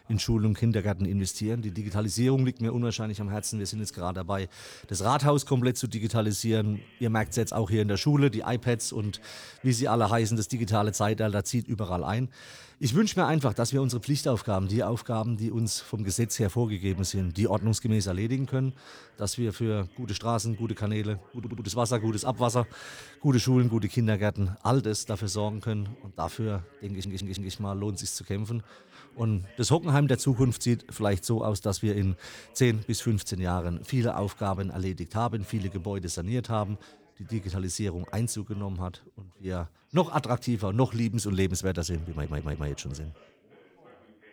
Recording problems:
background chatter; faint; throughout; 3 voices, 30 dB below the speech
audio stuttering; at 21 s, at 27 s and at 42 s

